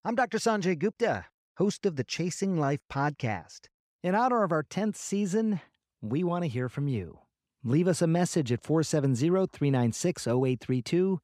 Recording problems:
none

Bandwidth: 15.5 kHz